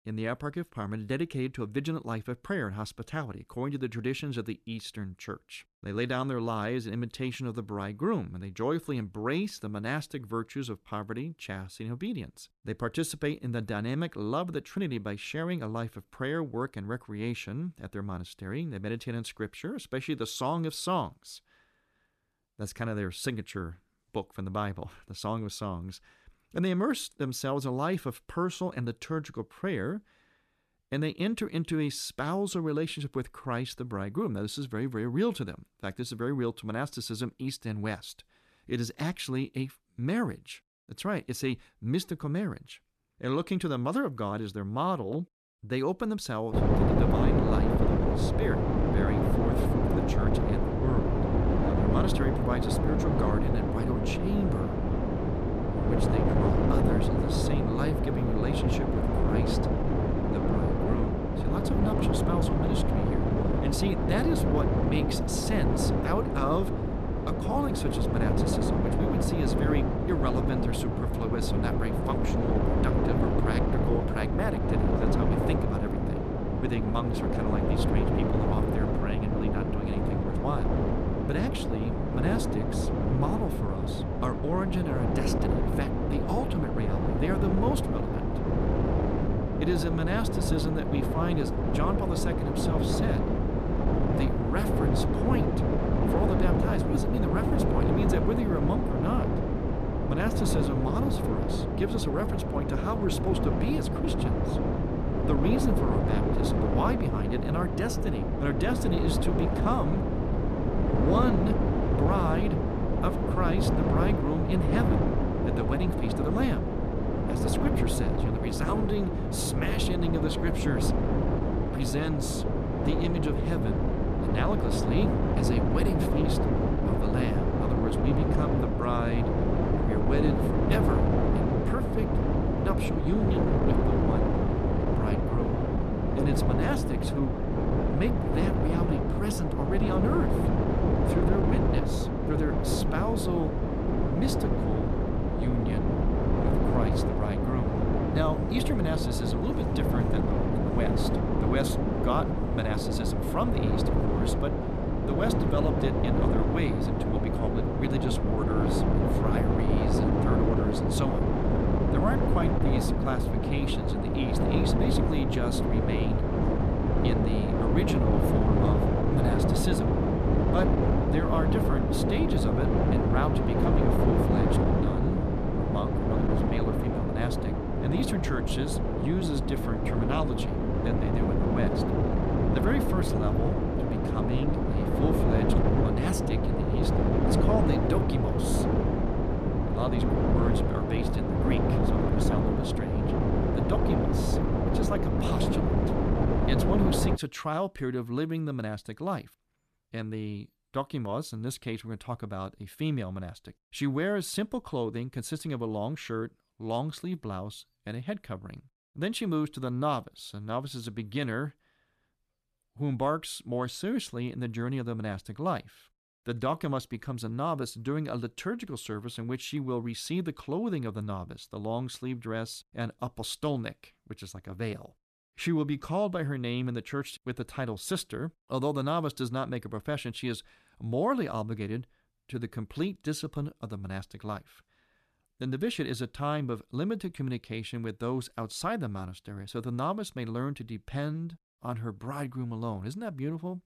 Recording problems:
wind noise on the microphone; heavy; from 47 s to 3:17; 3 dB above the speech

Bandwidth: 14 kHz